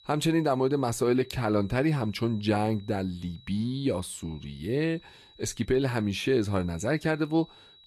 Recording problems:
garbled, watery; slightly; nothing above 12.5 kHz
high-pitched whine; faint; throughout; 4 kHz, 25 dB below the speech

